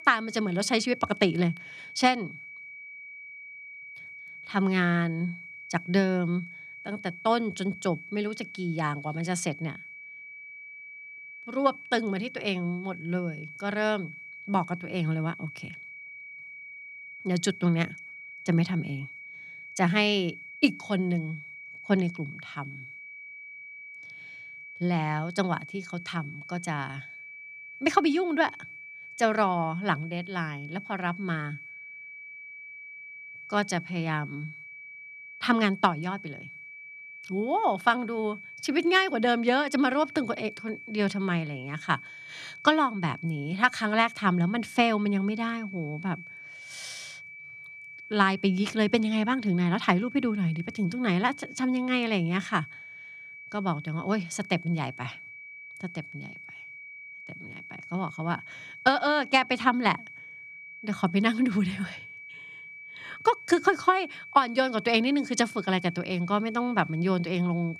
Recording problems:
high-pitched whine; noticeable; throughout; 2.5 kHz, 15 dB below the speech

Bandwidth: 13.5 kHz